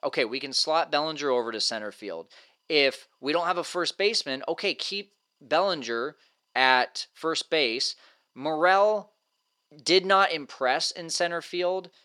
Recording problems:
thin; somewhat; fading below 400 Hz

